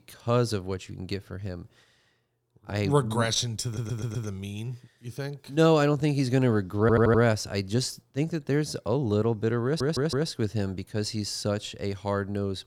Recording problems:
audio stuttering; at 3.5 s, at 7 s and at 9.5 s

